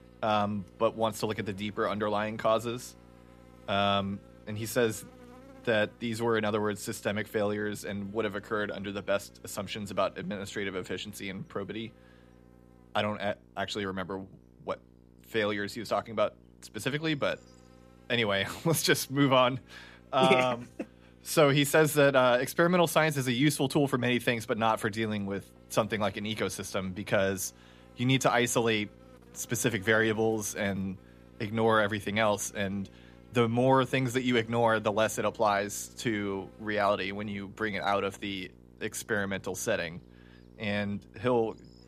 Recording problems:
electrical hum; faint; throughout; 60 Hz, 30 dB below the speech

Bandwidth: 14.5 kHz